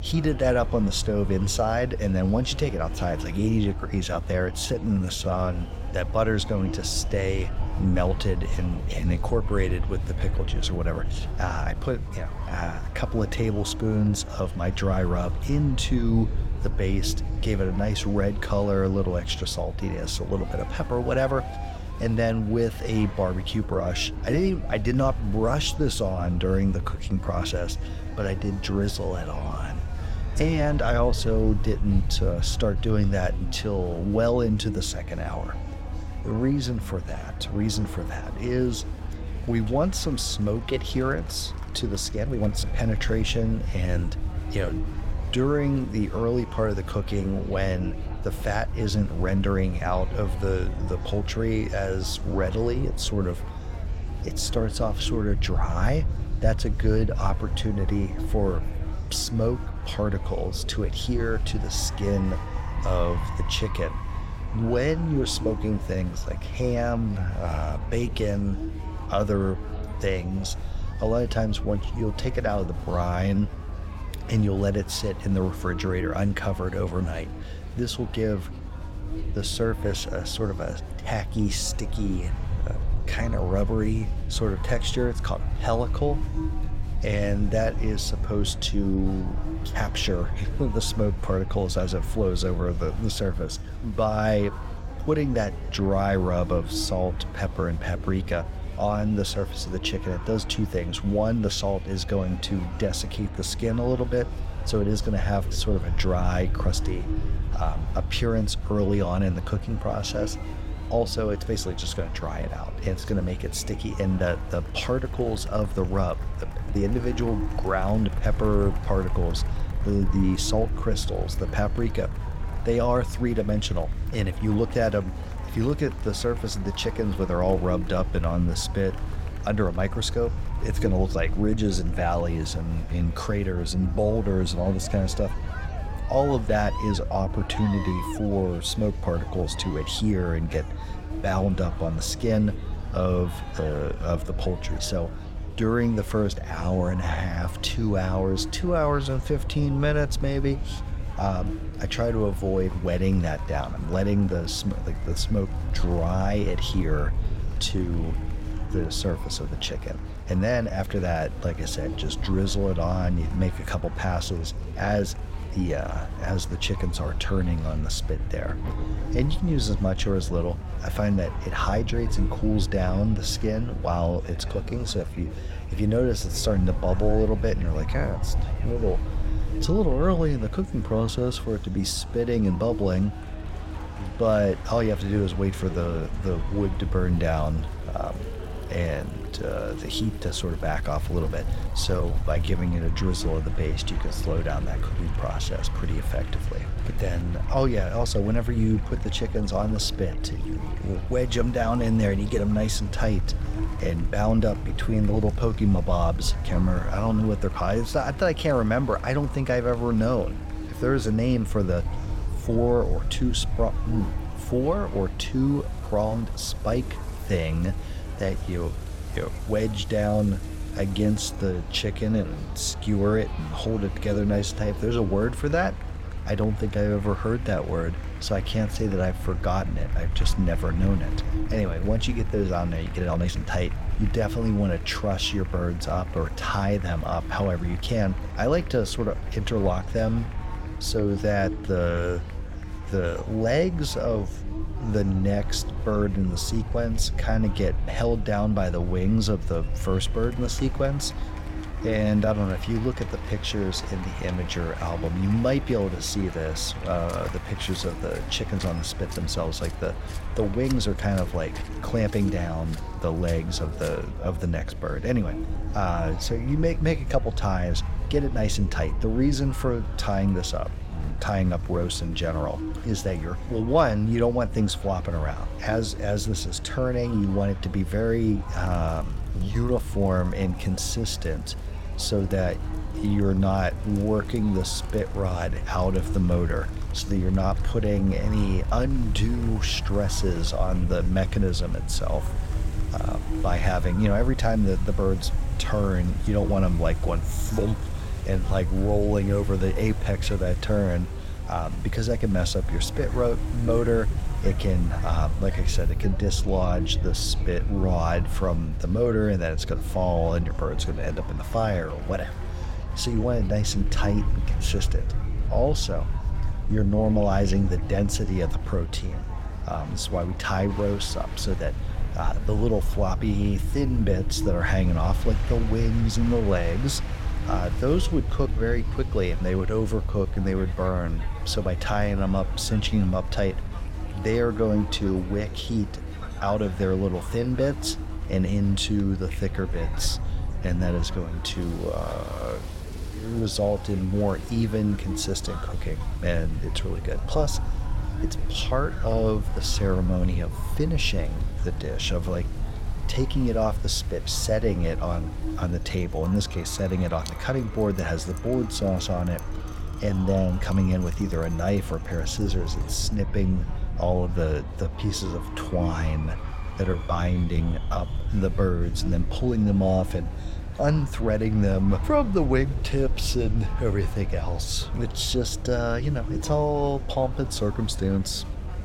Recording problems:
electrical hum; noticeable; throughout; 50 Hz, 20 dB below the speech
murmuring crowd; noticeable; throughout; 15 dB below the speech
rain or running water; faint; from 2:45 on; 25 dB below the speech
low rumble; faint; throughout; 20 dB below the speech
uneven, jittery; strongly; from 4.5 s to 6:08

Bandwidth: 16.5 kHz